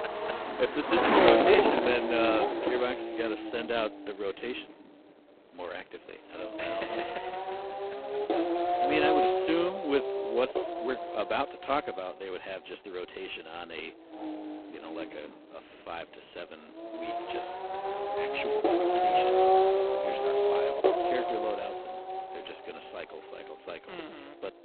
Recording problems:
phone-call audio; poor line; nothing above 4 kHz
traffic noise; very loud; throughout; 5 dB above the speech

